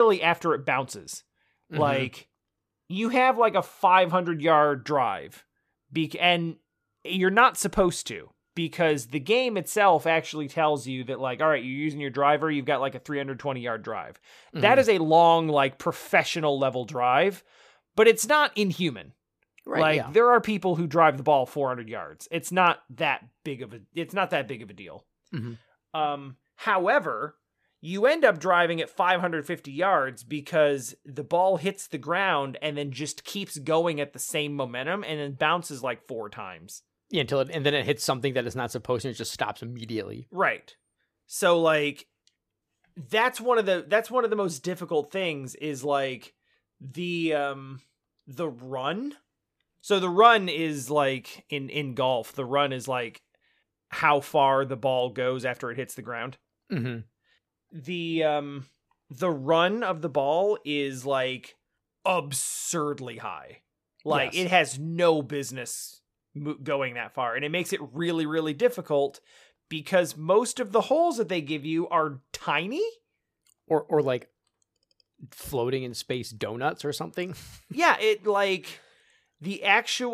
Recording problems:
abrupt cut into speech; at the start and the end

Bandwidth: 14.5 kHz